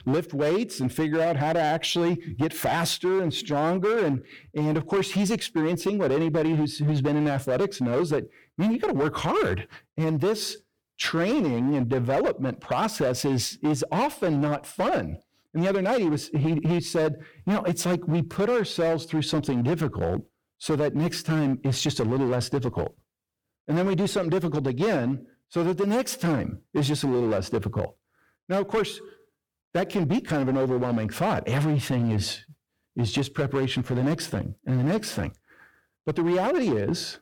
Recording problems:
distortion; slight; 14% of the sound clipped

